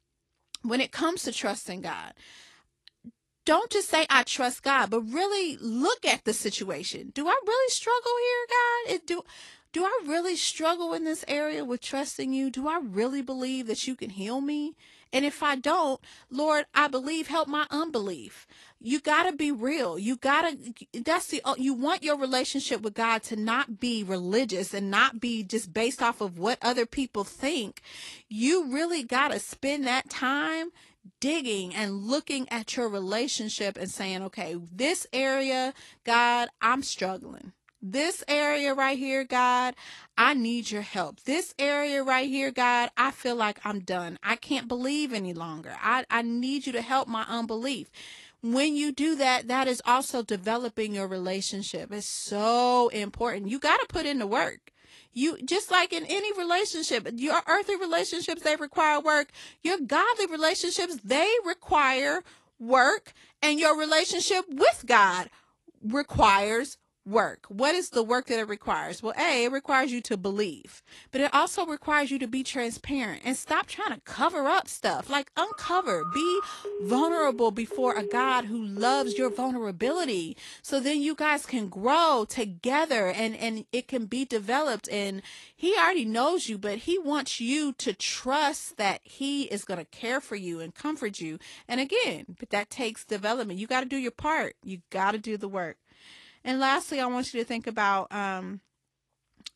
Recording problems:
garbled, watery; slightly; nothing above 11.5 kHz
phone ringing; noticeable; from 1:15 to 1:20; peak 4 dB below the speech

